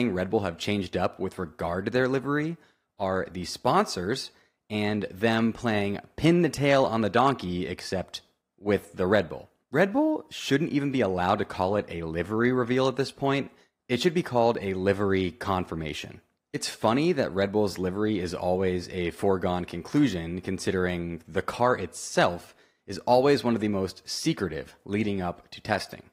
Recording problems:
garbled, watery; slightly; nothing above 15.5 kHz
abrupt cut into speech; at the start

